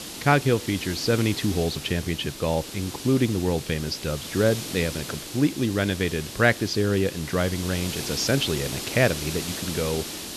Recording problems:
high frequencies cut off; noticeable; nothing above 8 kHz
hiss; loud; throughout; 8 dB below the speech

